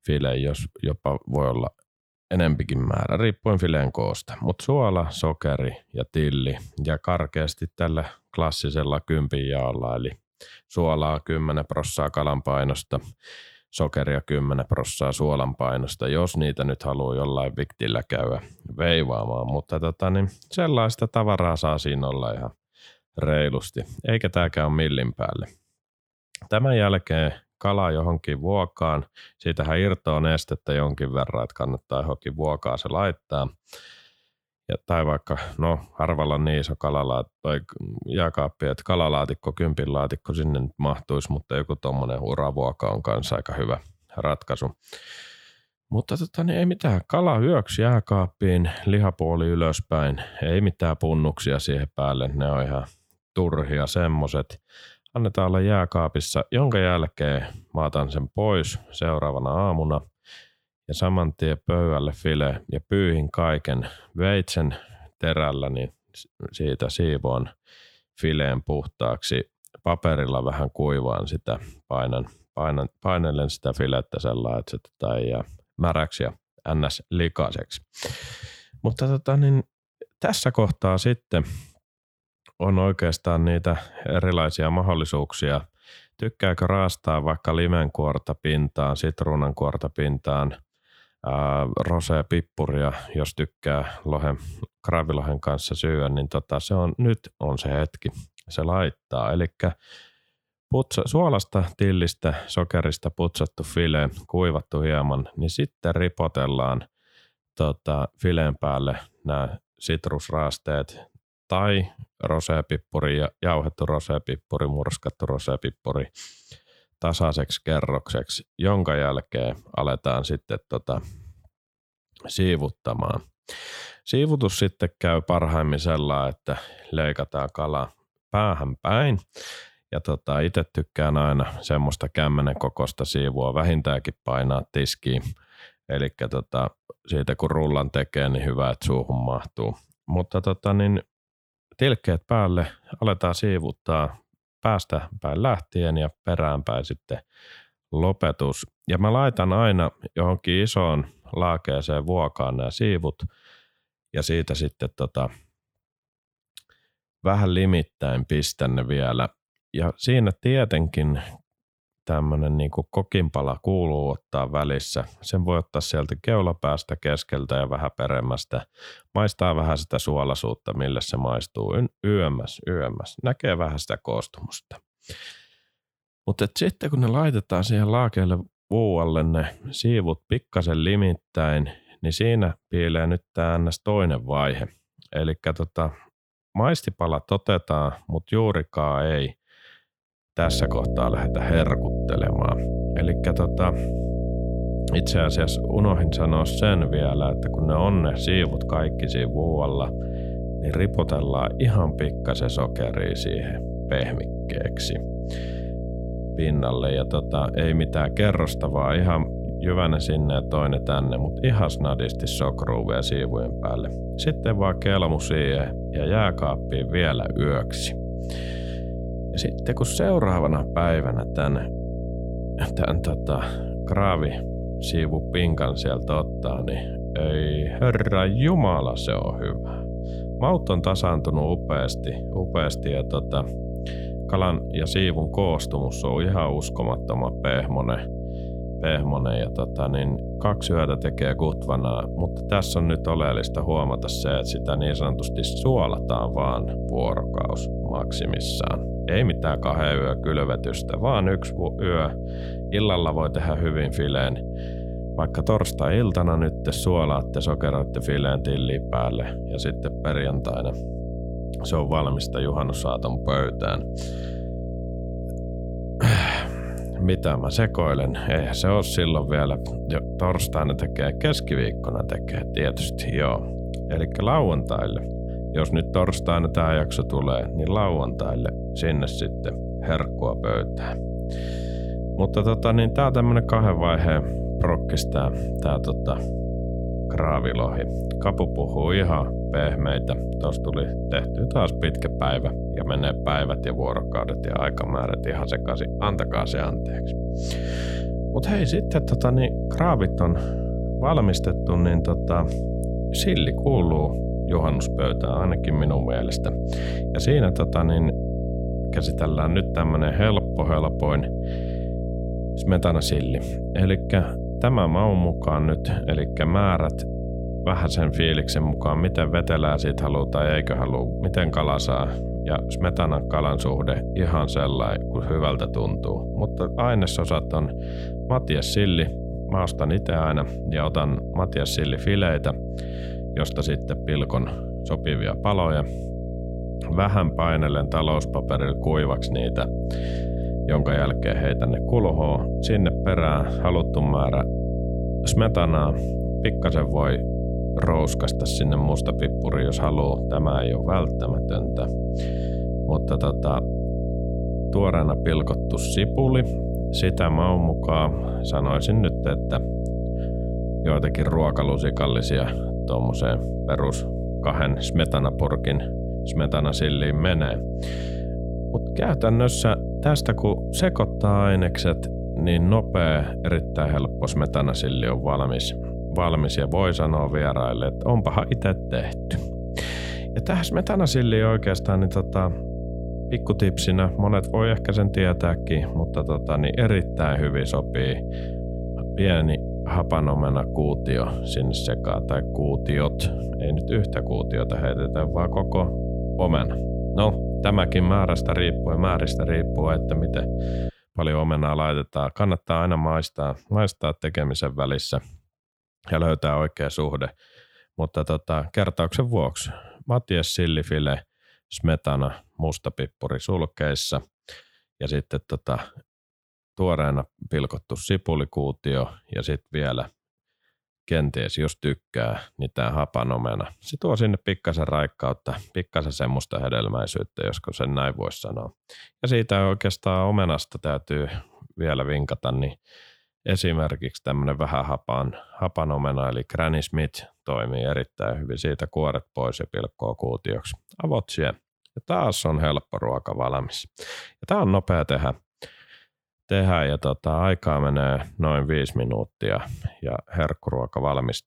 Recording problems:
electrical hum; loud; from 3:10 to 6:41; 60 Hz, 8 dB below the speech

